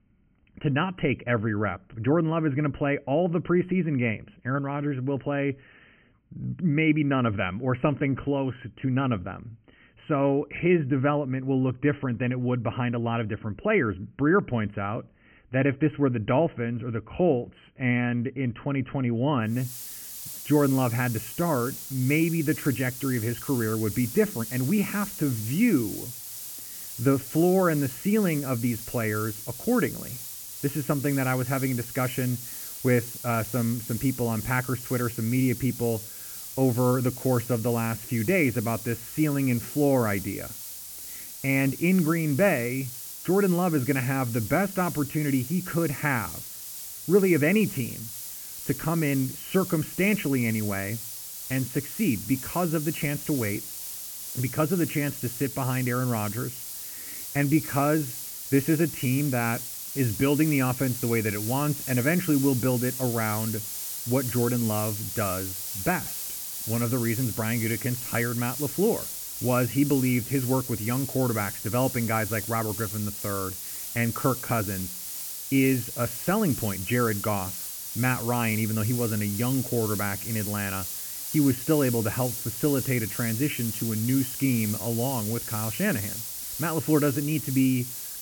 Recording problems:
high frequencies cut off; severe; nothing above 3 kHz
hiss; loud; from 20 s on; 7 dB below the speech

